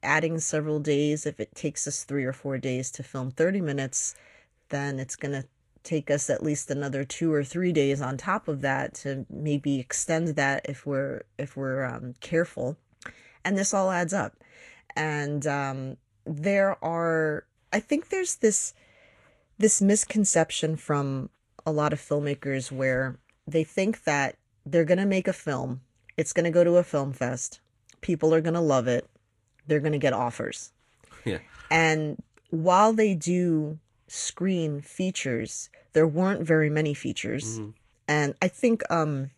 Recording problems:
garbled, watery; slightly

